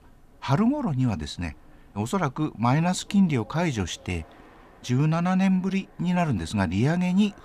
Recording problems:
train or aircraft noise; faint; throughout; 30 dB below the speech

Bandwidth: 14.5 kHz